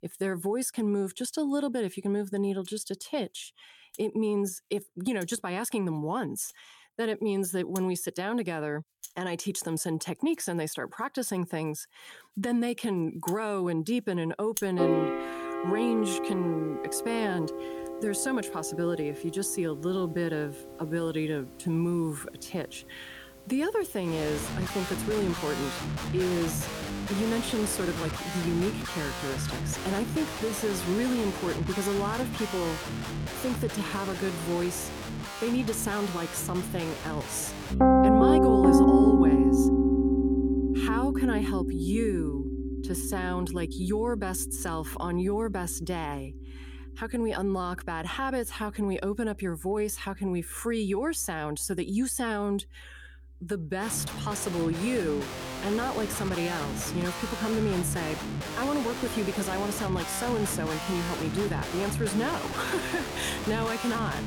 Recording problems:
background music; very loud; throughout; 1 dB above the speech

